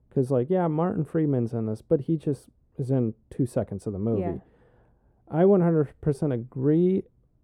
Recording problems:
muffled; very; fading above 1 kHz

